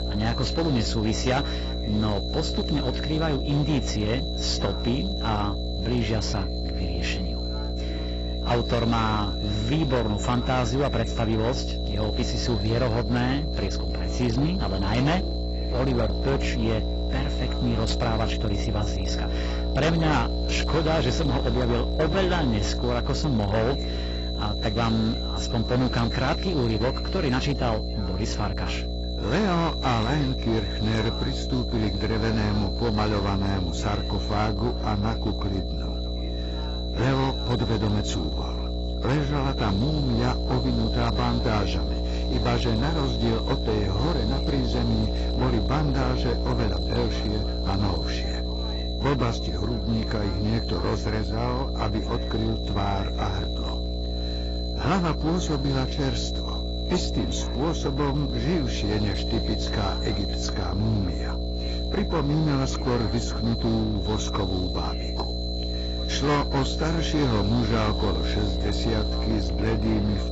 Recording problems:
garbled, watery; badly; nothing above 7.5 kHz
distortion; slight; 19% of the sound clipped
electrical hum; loud; throughout; 60 Hz, 7 dB below the speech
high-pitched whine; loud; throughout; 4 kHz, 10 dB below the speech
voice in the background; faint; throughout; 20 dB below the speech

